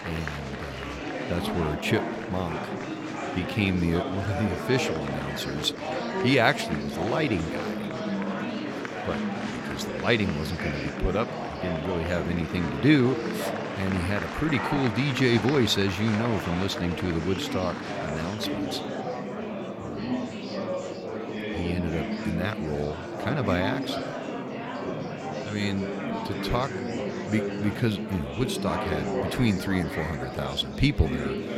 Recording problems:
murmuring crowd; loud; throughout; 4 dB below the speech

